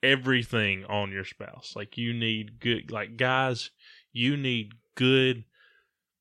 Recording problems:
none

